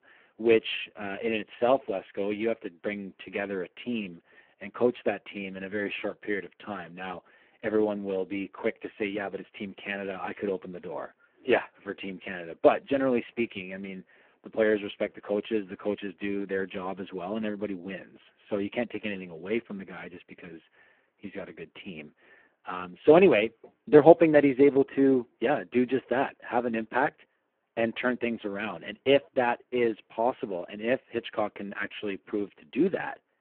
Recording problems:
phone-call audio; poor line

